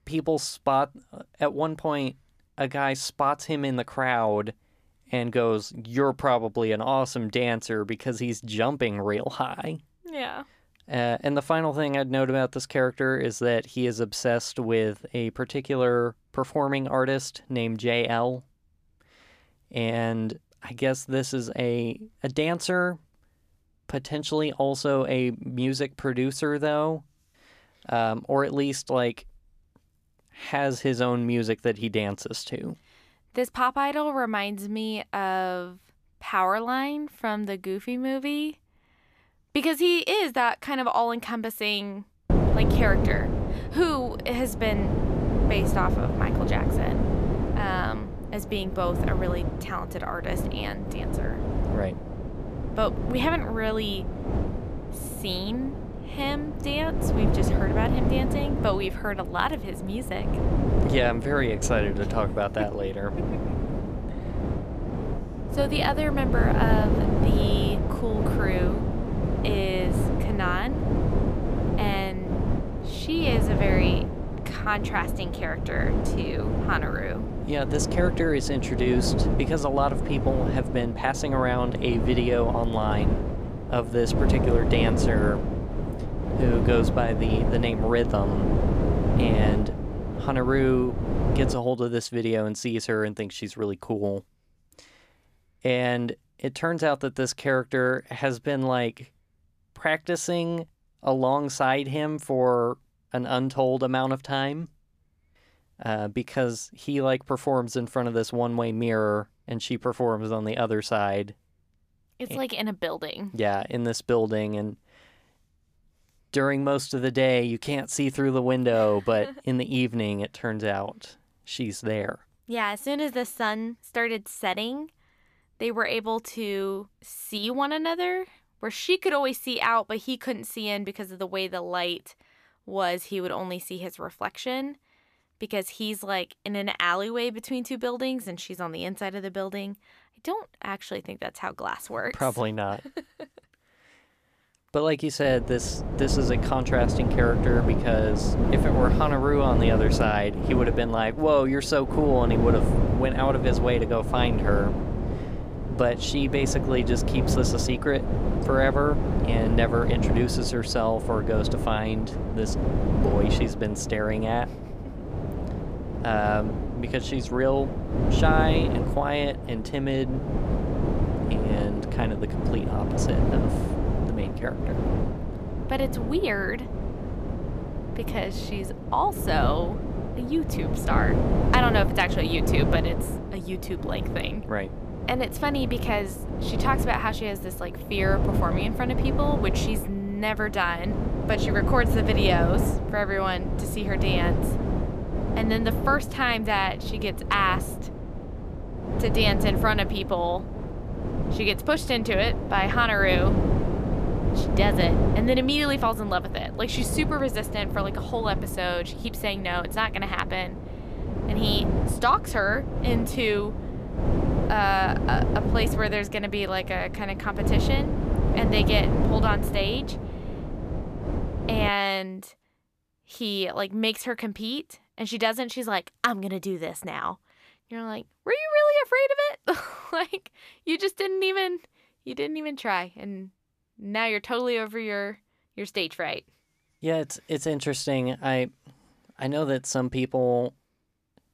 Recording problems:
wind noise on the microphone; heavy; from 42 s to 1:32 and from 2:25 to 3:42; 6 dB below the speech

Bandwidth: 14.5 kHz